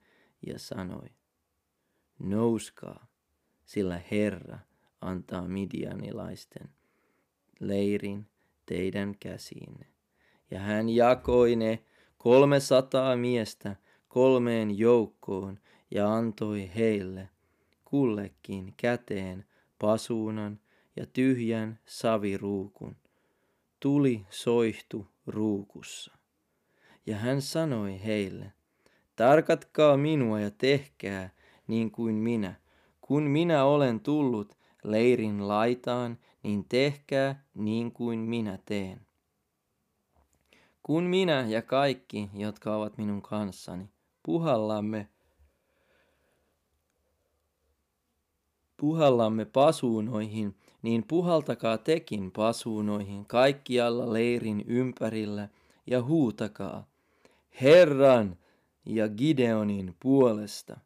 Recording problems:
none

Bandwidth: 15 kHz